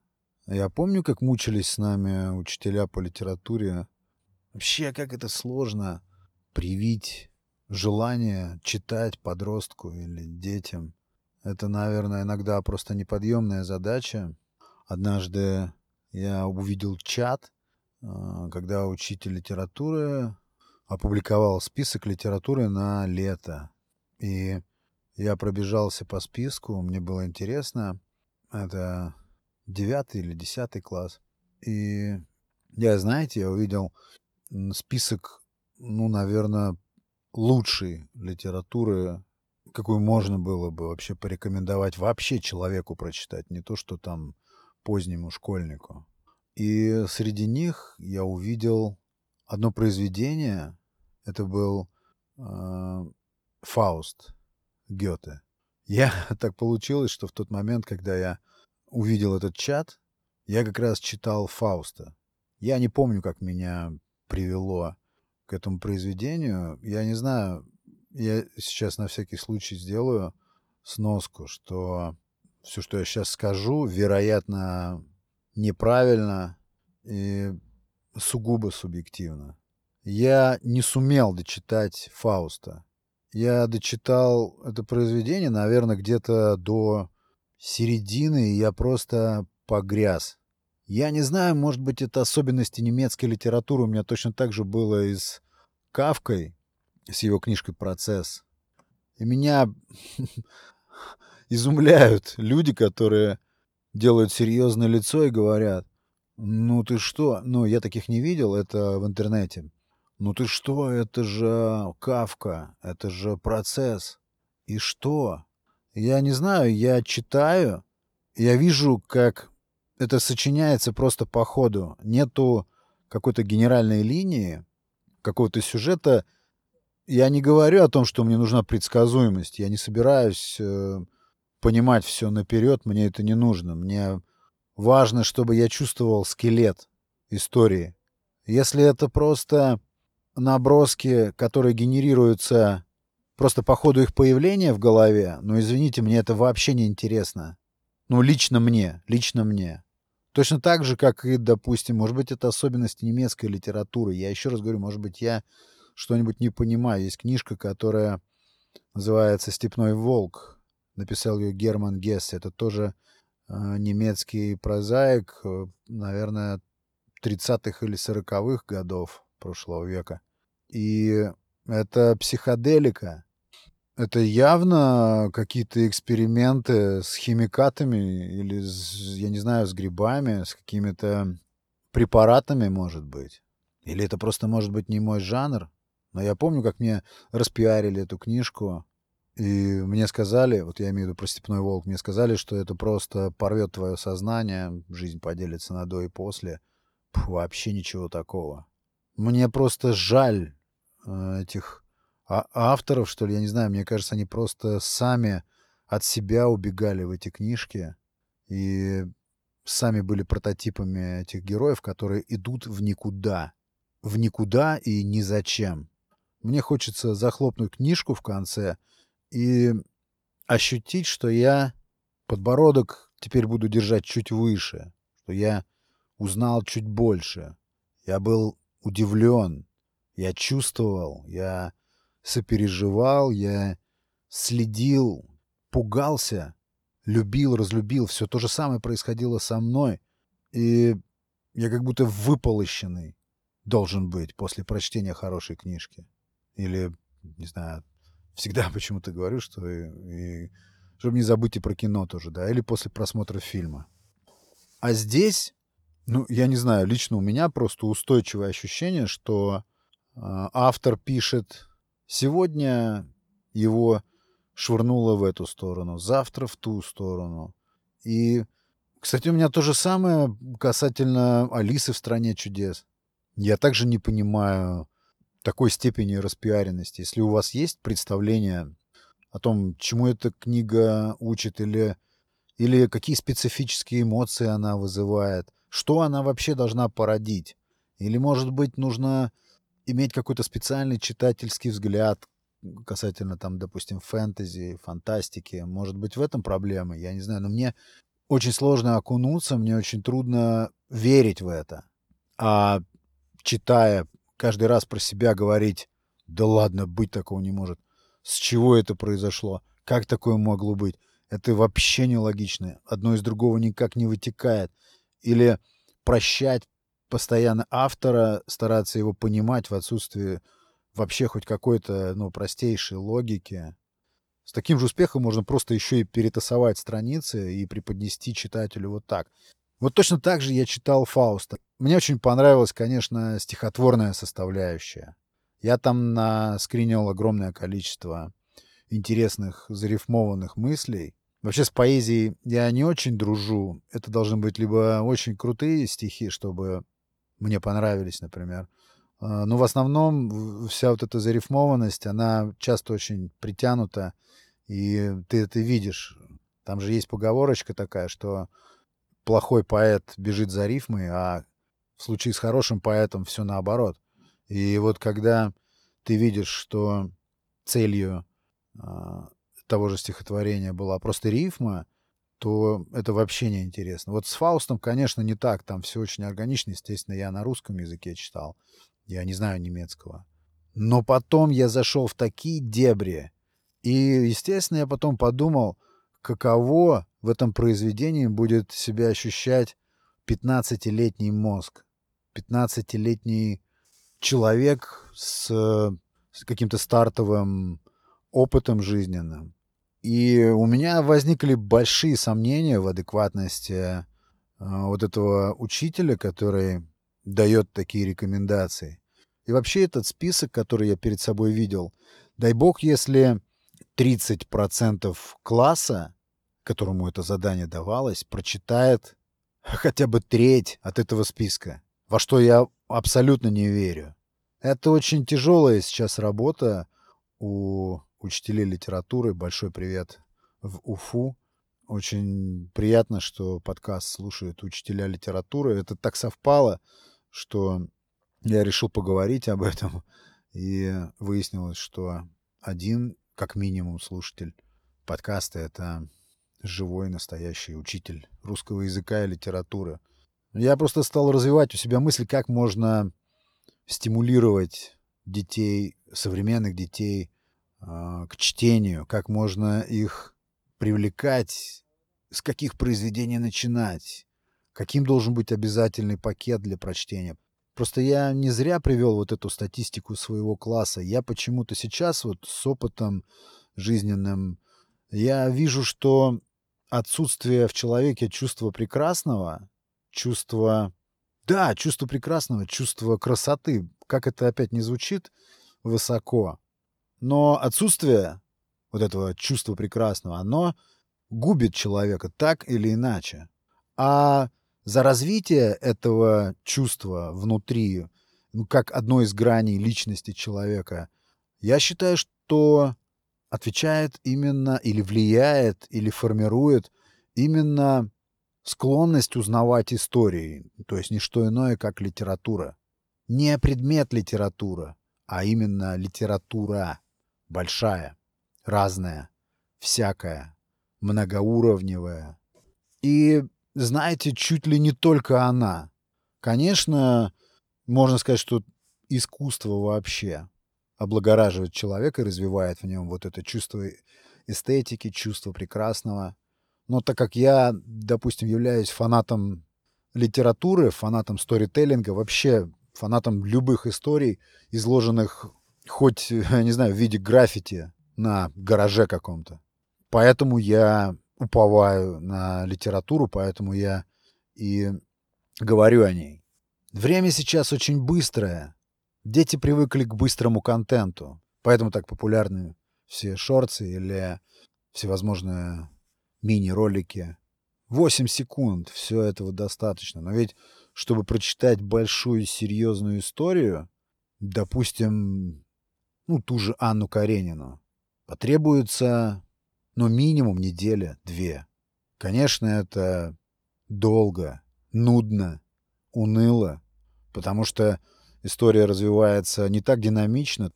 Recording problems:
none

